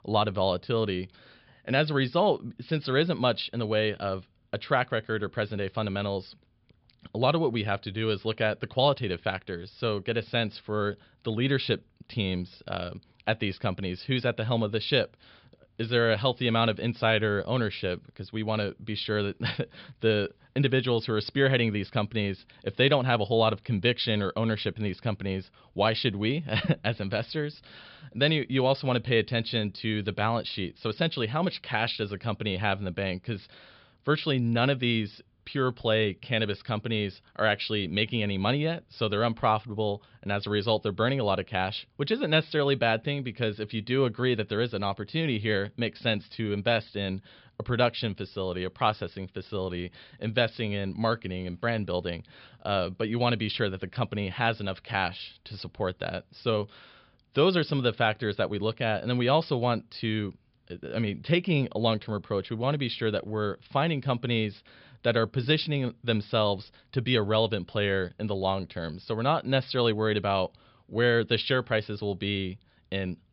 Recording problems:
high frequencies cut off; noticeable; nothing above 5 kHz

